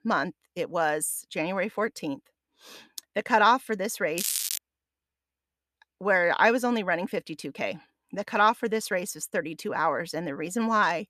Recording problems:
crackling; loud; at 4 s; 2 dB below the speech

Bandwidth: 14.5 kHz